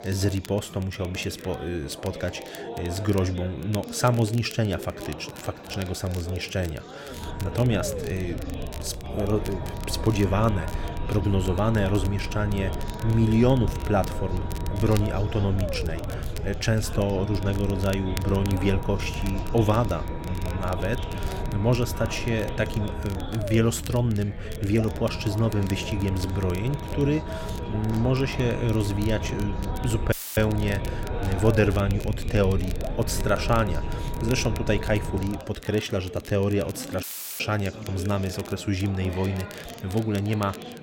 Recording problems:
low rumble; loud; from 7 to 35 s; 9 dB below the speech
chatter from many people; noticeable; throughout; 15 dB below the speech
crackle, like an old record; noticeable; 20 dB below the speech
audio cutting out; filled with static; at 30 s and at 37 s

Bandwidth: 16.5 kHz